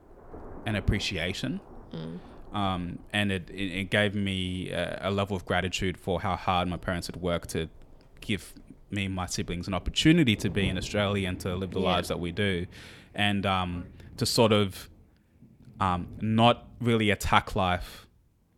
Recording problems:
rain or running water; noticeable; throughout; 20 dB below the speech

